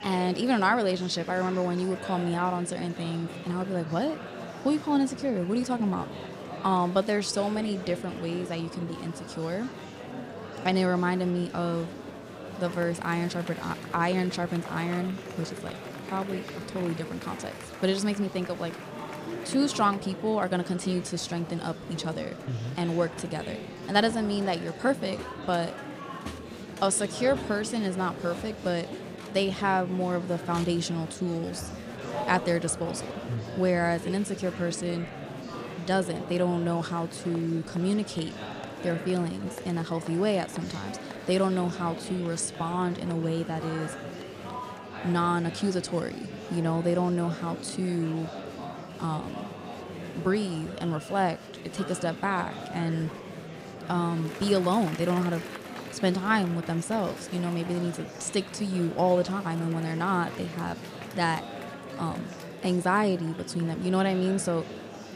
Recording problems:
murmuring crowd; noticeable; throughout; 10 dB below the speech

